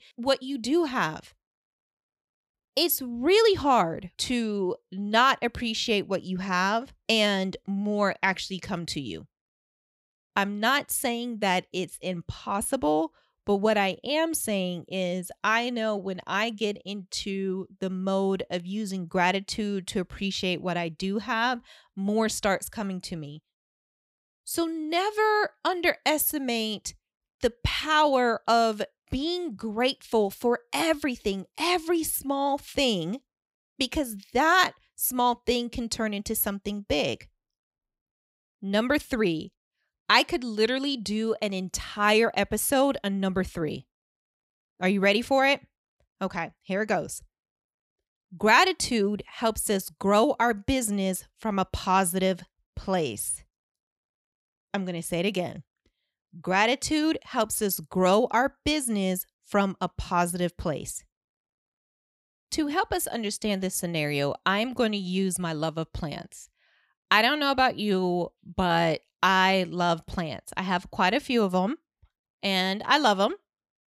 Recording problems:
none

